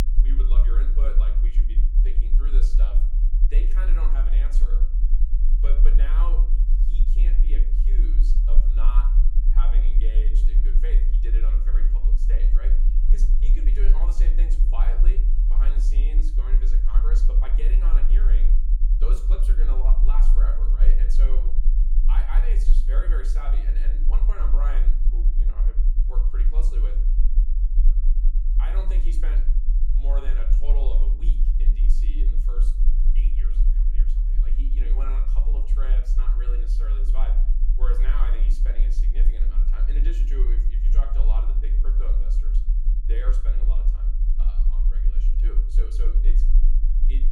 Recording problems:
room echo; slight; dies away in 0.4 s
off-mic speech; somewhat distant
low rumble; loud; throughout; 6 dB below the speech

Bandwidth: 17.5 kHz